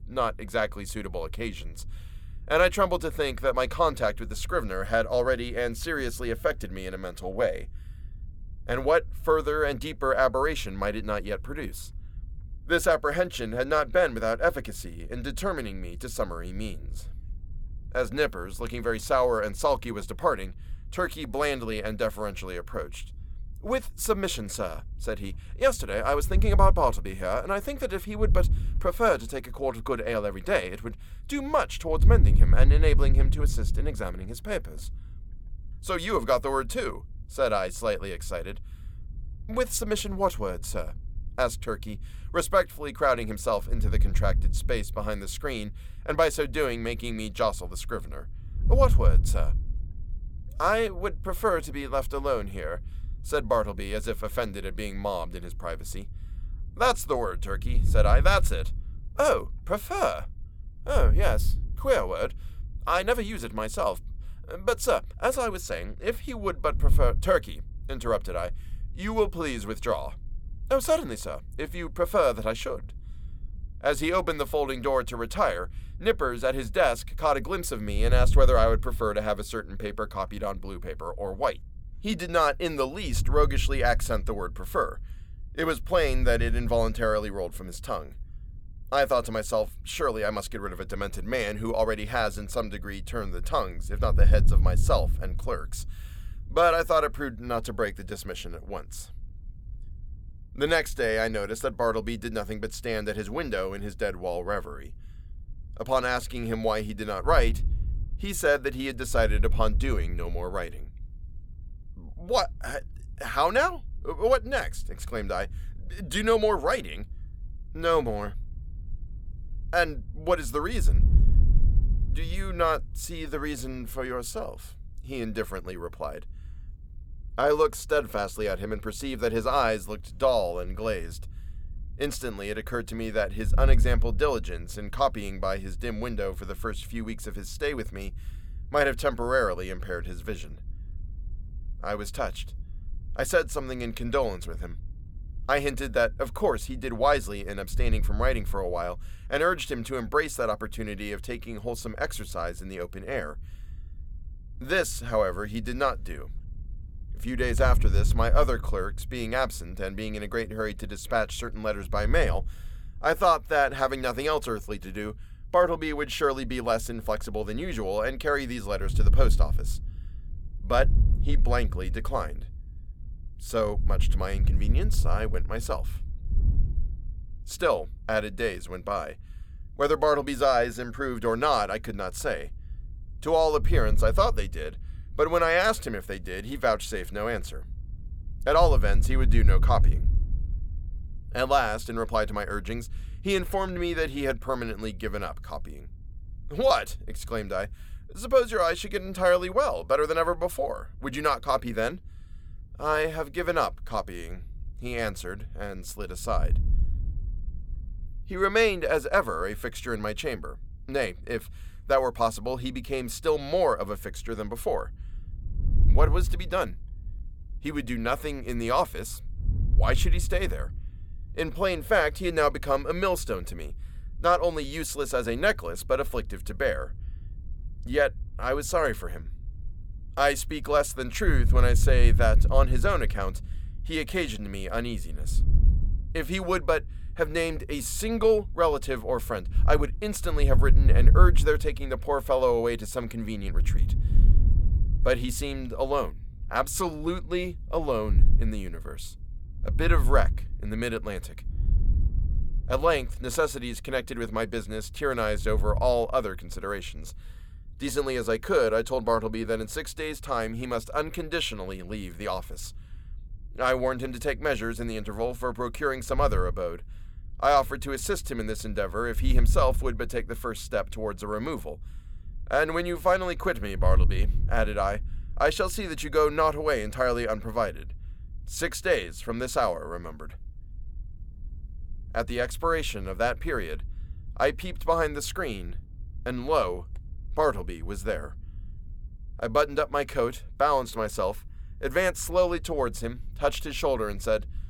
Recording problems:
wind noise on the microphone; occasional gusts; 25 dB below the speech

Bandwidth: 18 kHz